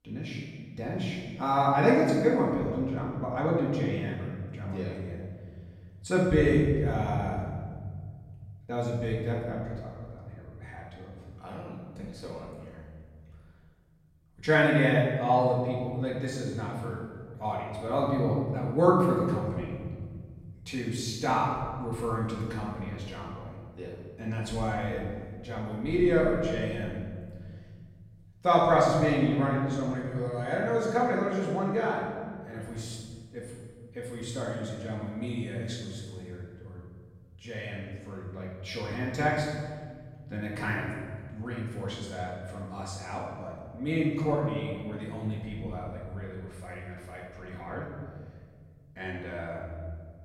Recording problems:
off-mic speech; far
room echo; noticeable; dies away in 2 s

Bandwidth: 16 kHz